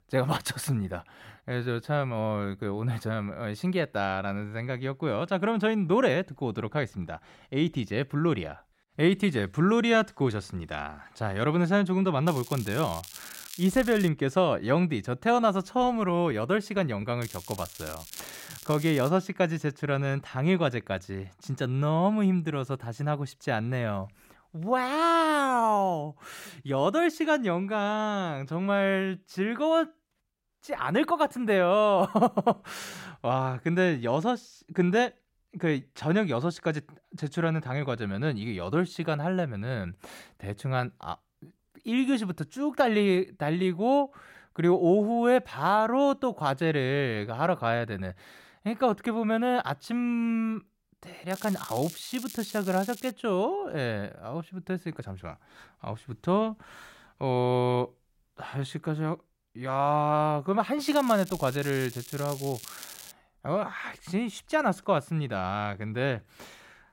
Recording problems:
crackling; noticeable; 4 times, first at 12 s; 15 dB below the speech

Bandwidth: 16 kHz